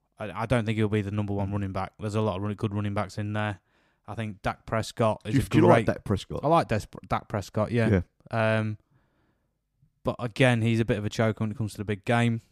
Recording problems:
none

